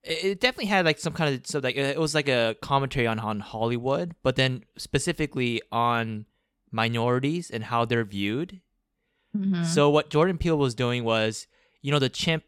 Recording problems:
none

